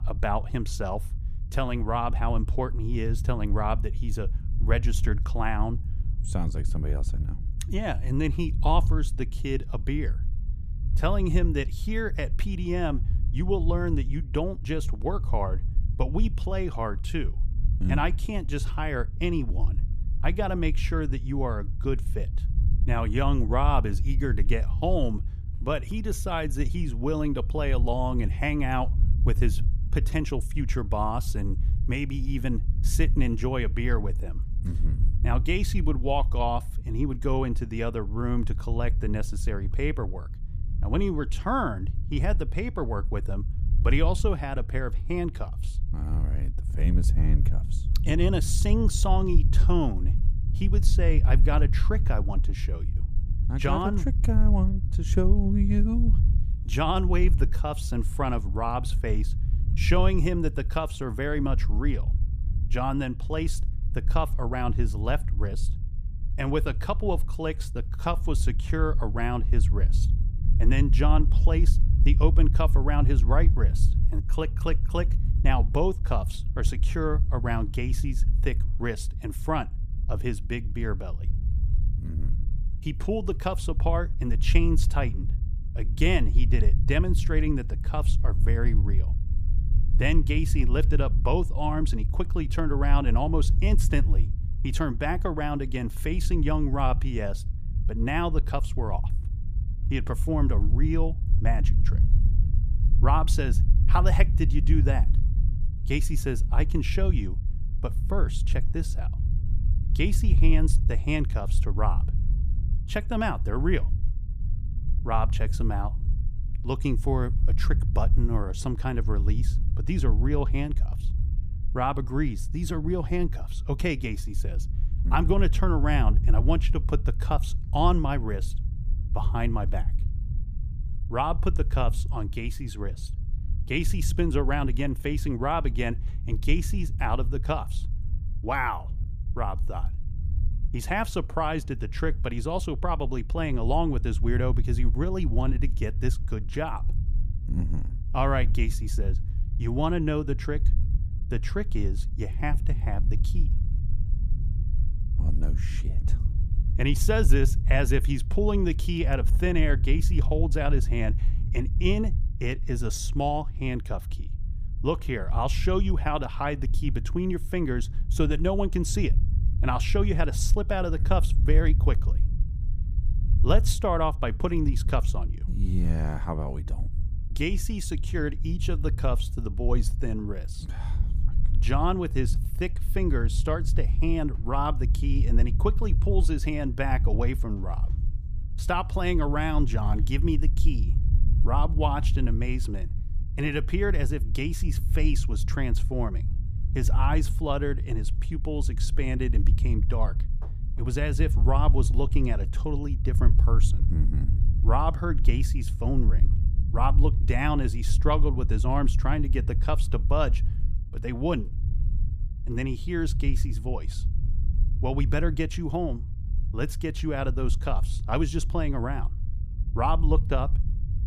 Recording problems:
low rumble; noticeable; throughout; 15 dB below the speech

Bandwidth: 15 kHz